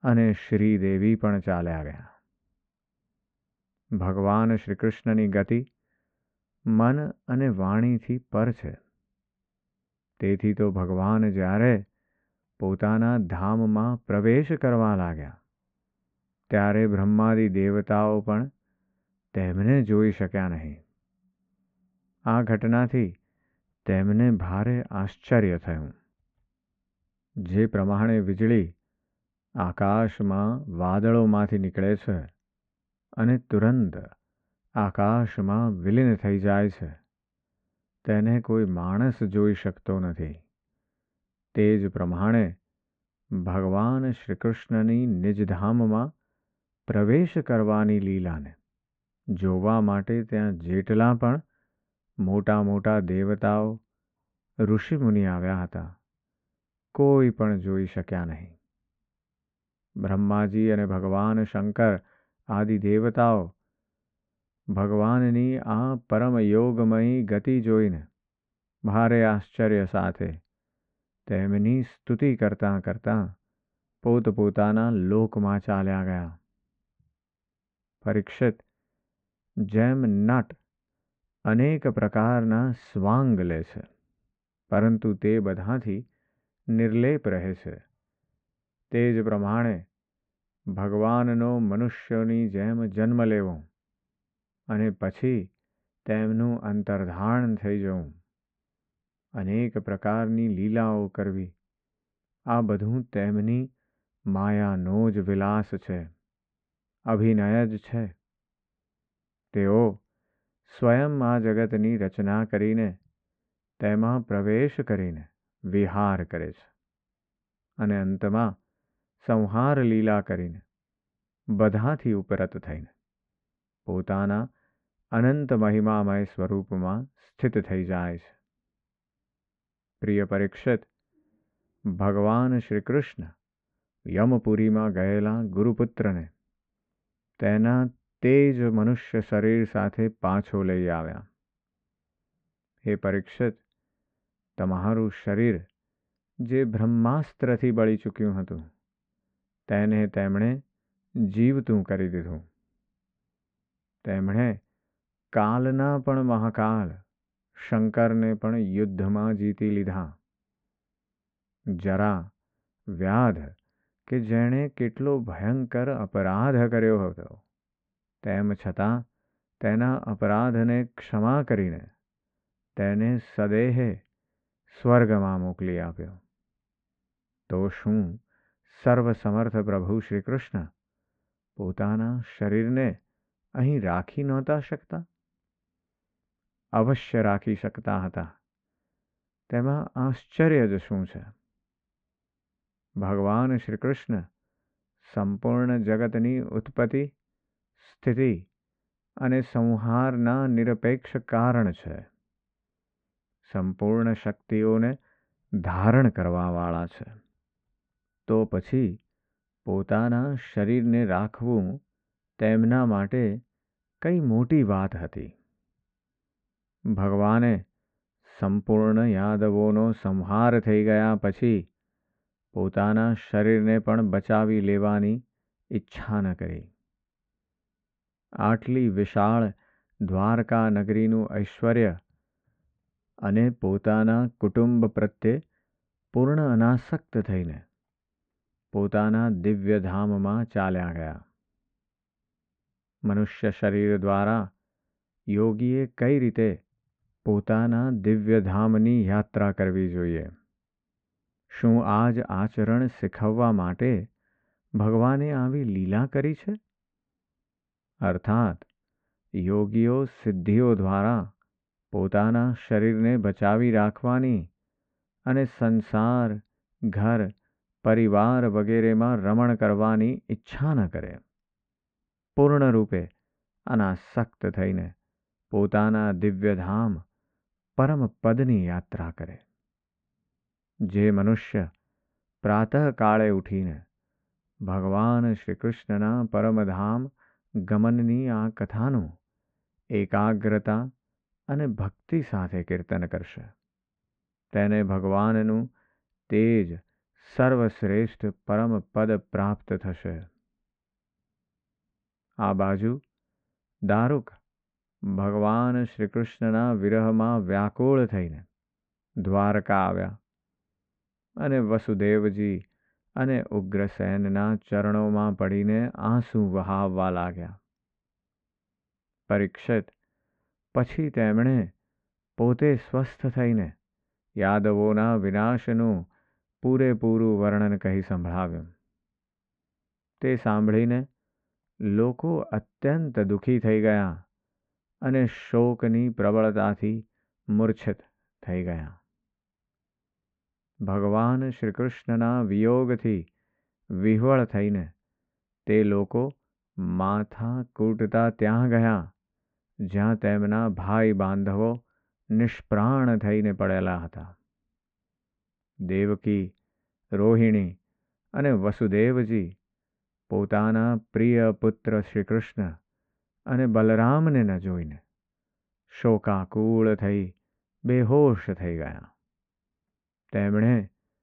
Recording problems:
muffled; very; fading above 2 kHz

